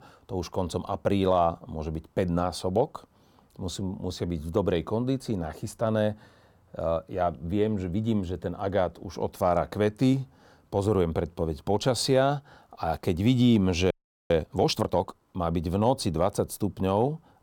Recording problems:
audio freezing; at 14 s

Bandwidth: 18 kHz